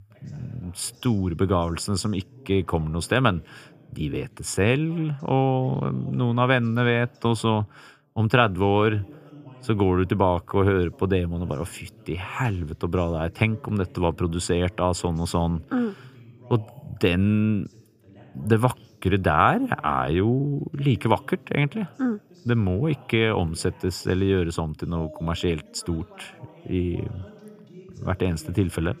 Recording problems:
voice in the background; faint; throughout; 25 dB below the speech

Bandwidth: 15 kHz